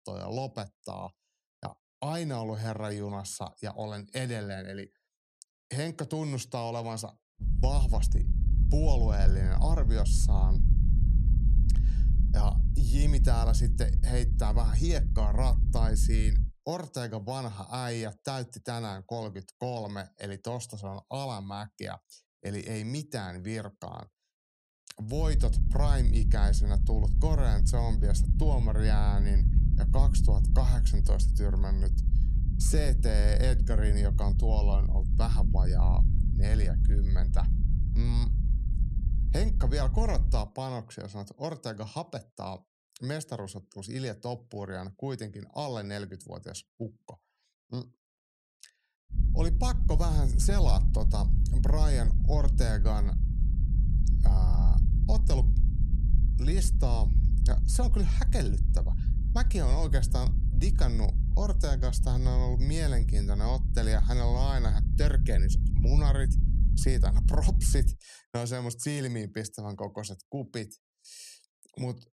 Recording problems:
low rumble; loud; from 7.5 to 16 s, from 25 to 40 s and from 49 s to 1:08; 8 dB below the speech

